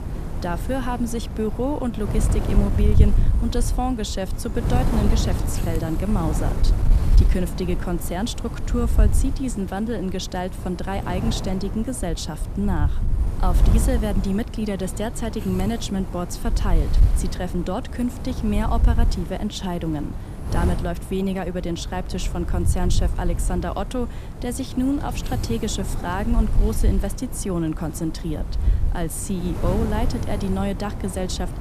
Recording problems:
wind noise on the microphone; heavy; 8 dB below the speech

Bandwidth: 14.5 kHz